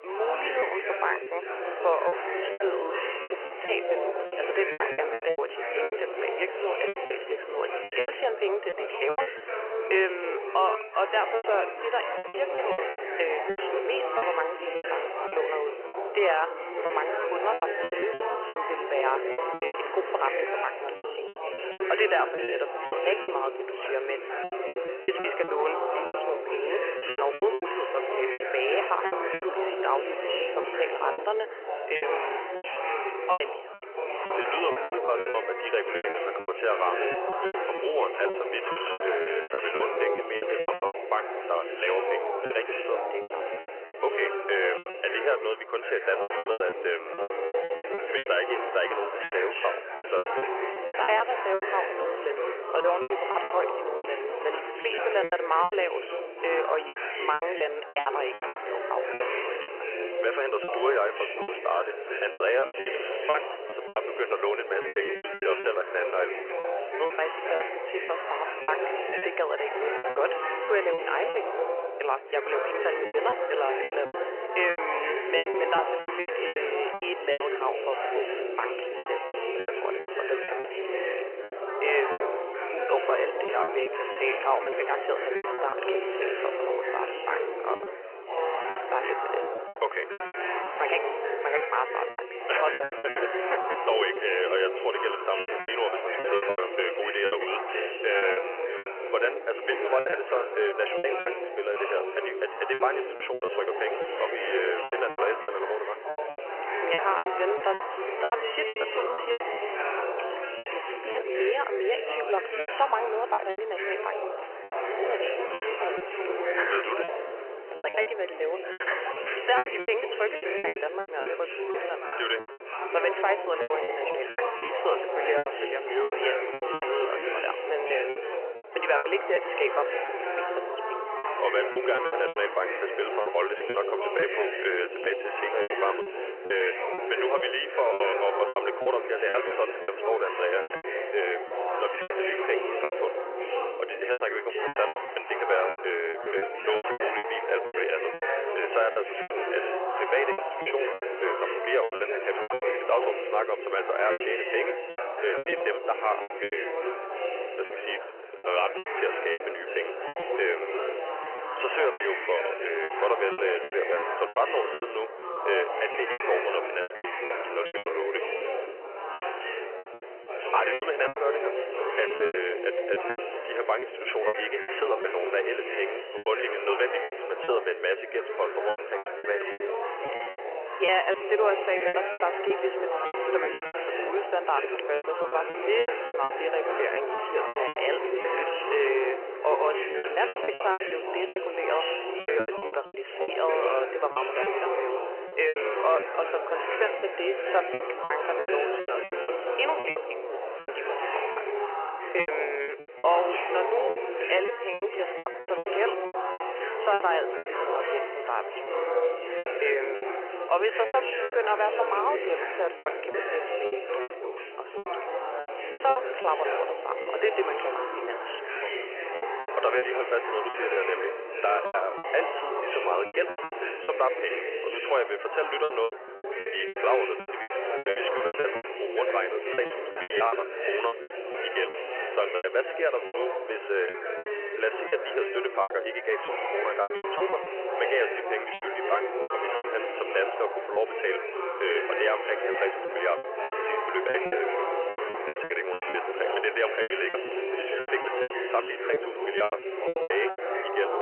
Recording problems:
phone-call audio; nothing above 3 kHz
chatter from many people; loud; throughout; 2 dB below the speech
choppy; very; 13% of the speech affected

